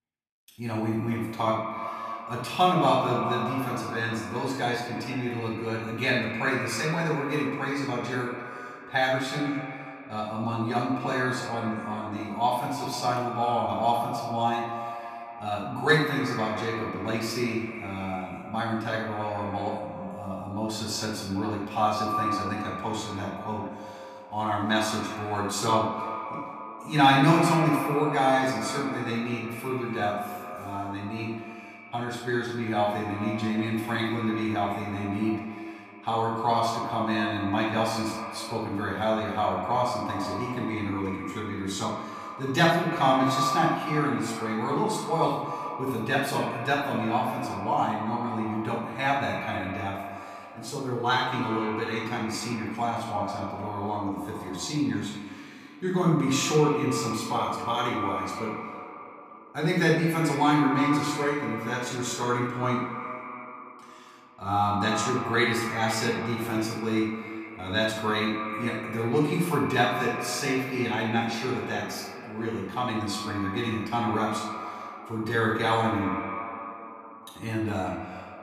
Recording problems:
echo of what is said; strong; throughout; 130 ms later, 8 dB below the speech
off-mic speech; far
room echo; noticeable; dies away in 0.6 s

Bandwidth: 14.5 kHz